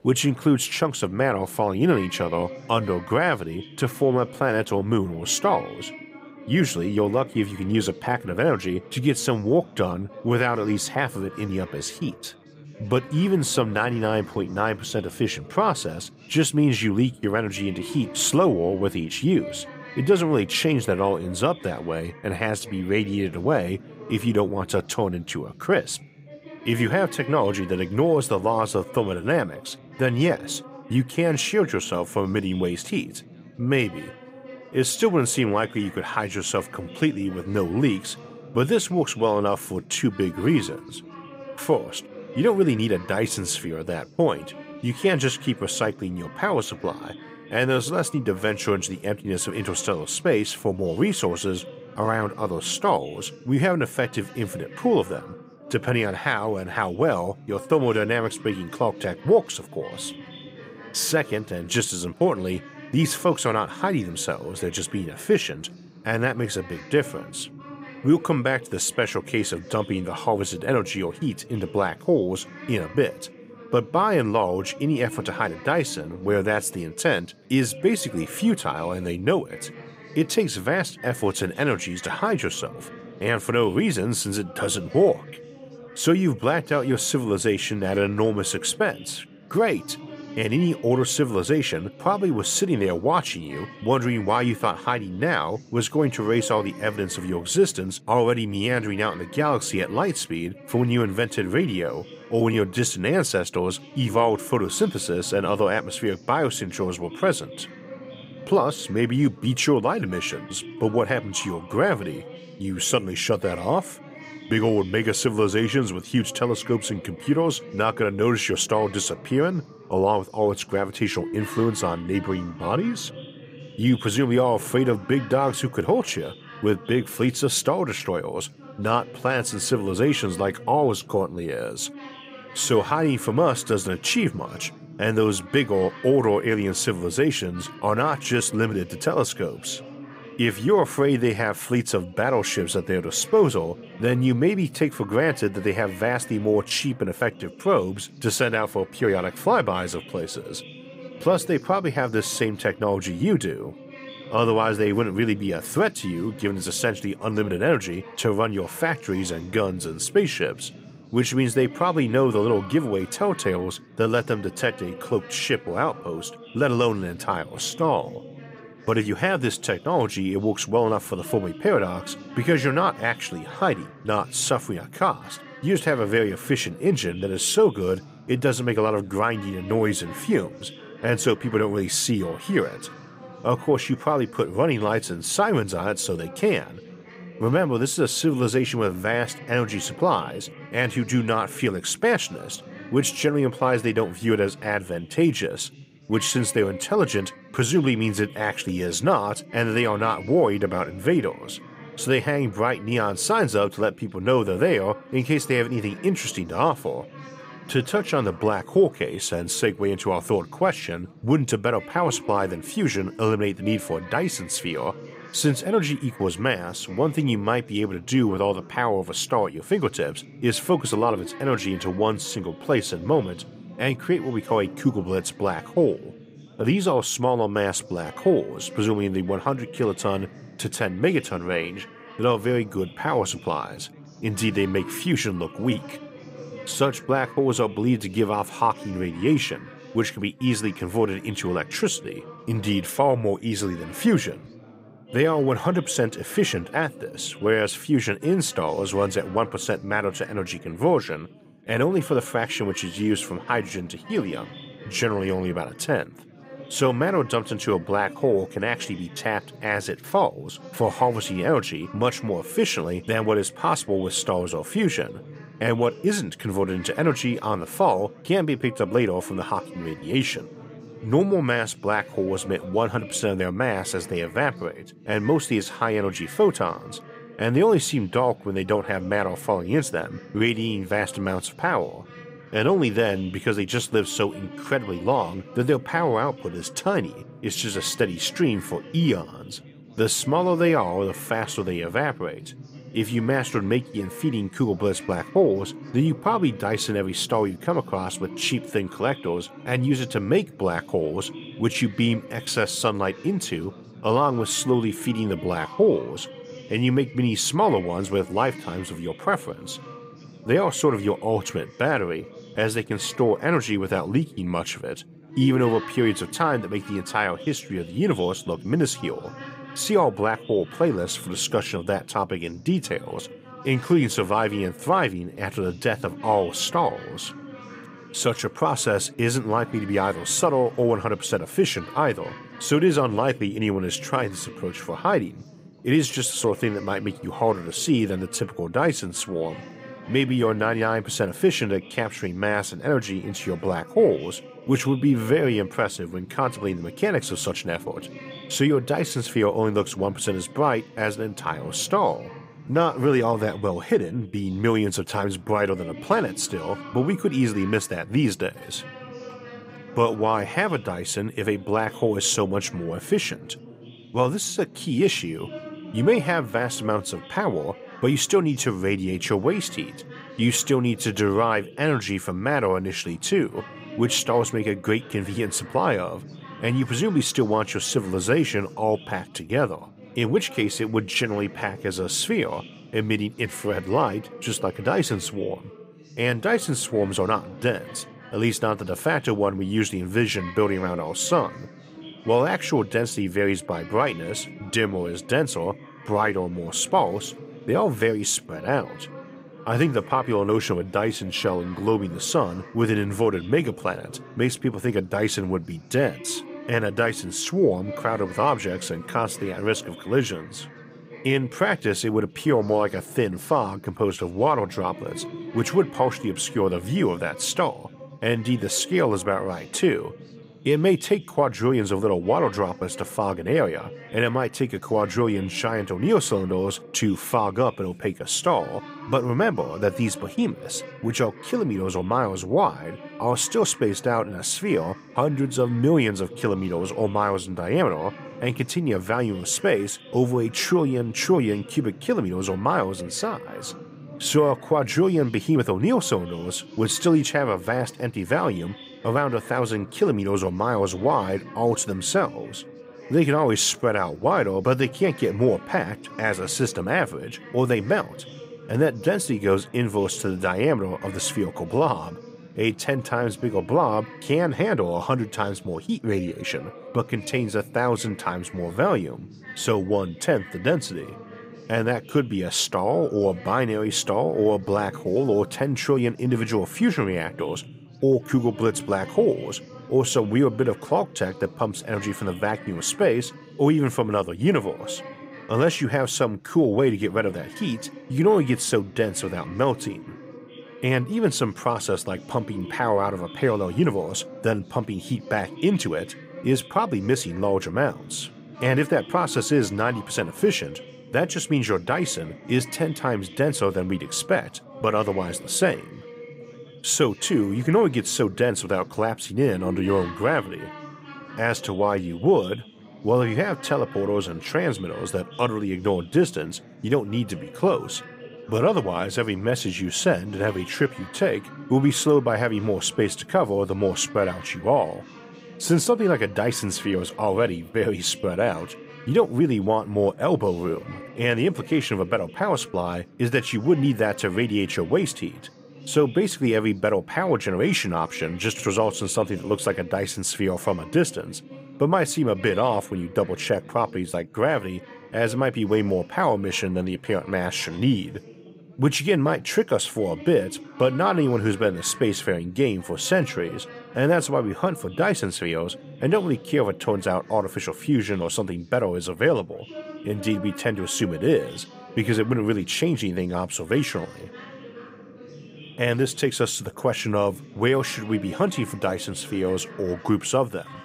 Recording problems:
chatter from many people; noticeable; throughout; 20 dB below the speech

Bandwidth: 15.5 kHz